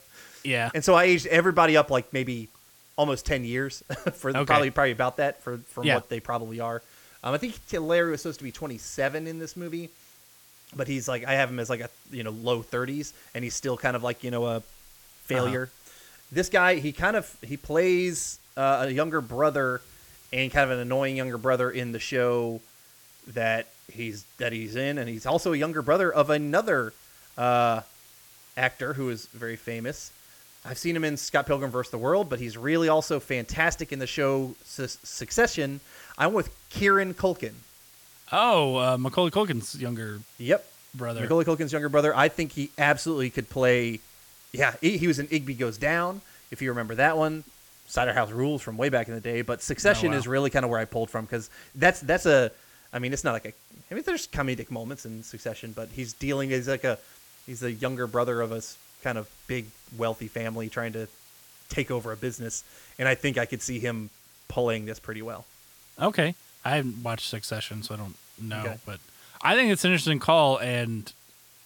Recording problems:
hiss; faint; throughout; 25 dB below the speech

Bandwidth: 18 kHz